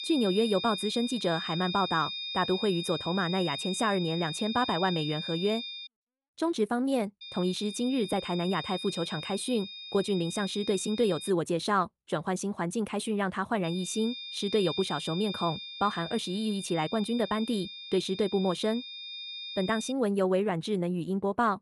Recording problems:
high-pitched whine; loud; until 6 s, from 7 to 11 s and from 14 to 20 s; 3.5 kHz, 7 dB below the speech

